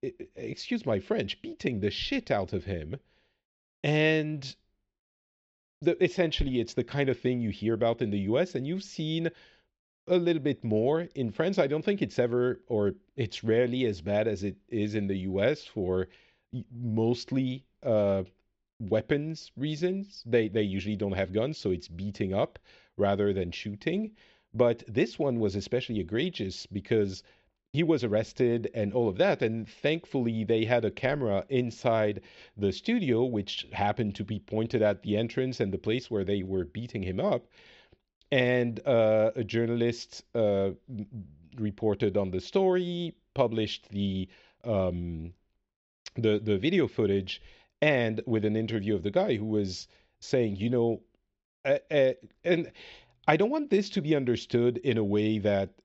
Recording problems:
high frequencies cut off; noticeable; nothing above 7.5 kHz
muffled; very slightly; fading above 2.5 kHz

